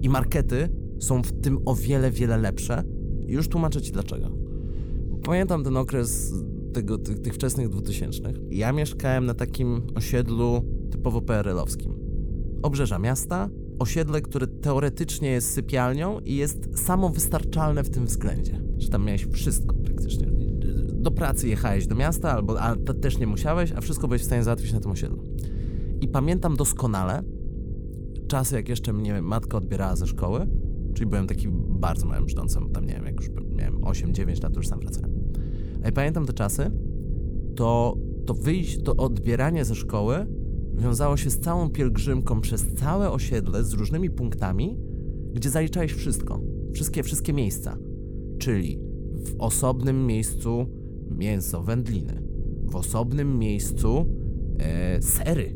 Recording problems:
electrical hum; noticeable; throughout; 50 Hz, 15 dB below the speech
low rumble; noticeable; throughout; 15 dB below the speech

